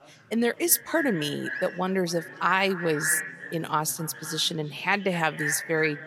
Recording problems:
echo of what is said; strong; throughout; 250 ms later, 8 dB below the speech
chatter from many people; faint; throughout; 25 dB below the speech

